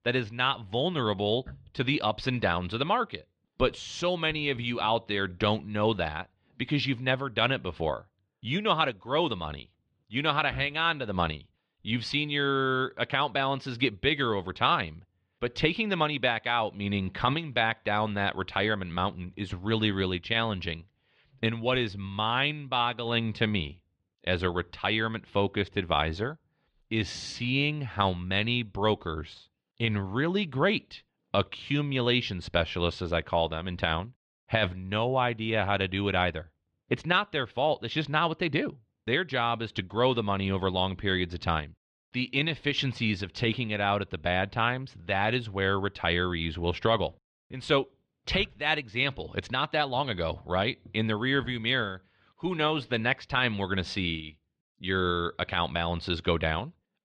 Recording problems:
muffled; slightly; fading above 3.5 kHz

